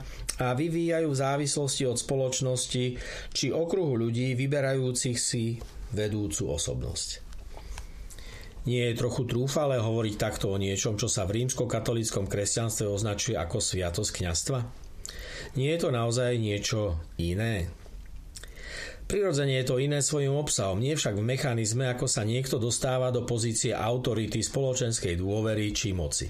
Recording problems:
squashed, flat; heavily

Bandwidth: 14.5 kHz